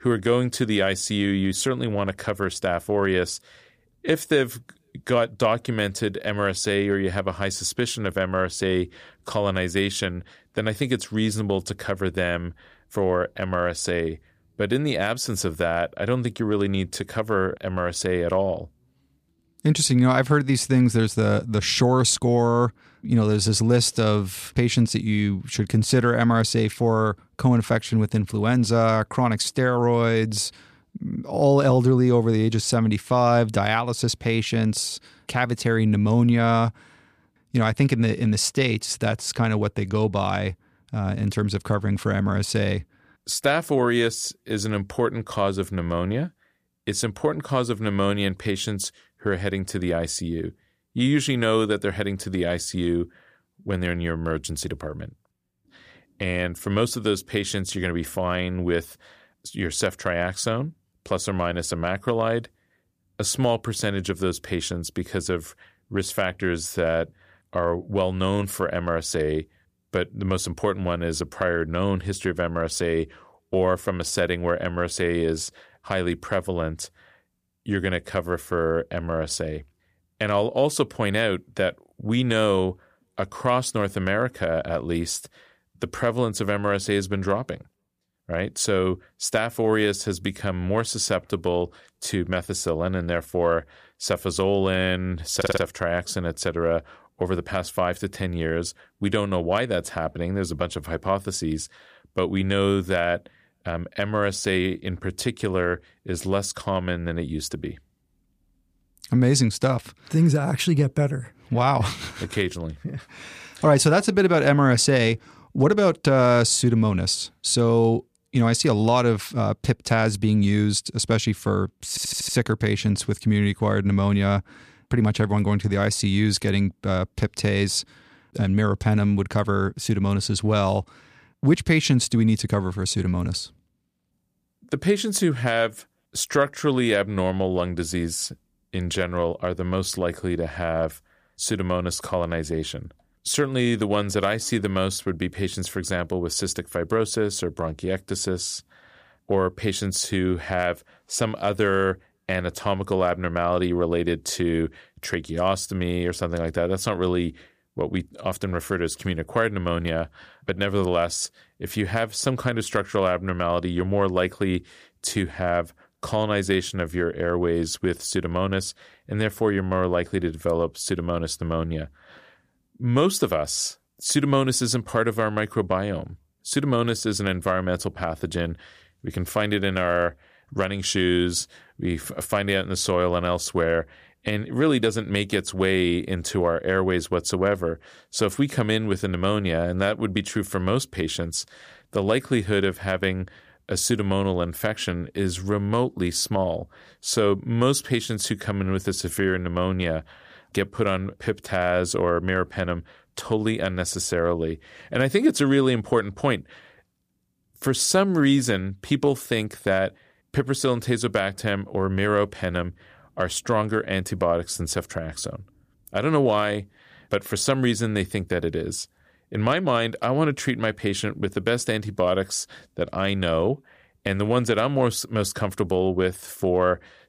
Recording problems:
audio stuttering; at 1:35 and at 2:02

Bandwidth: 15 kHz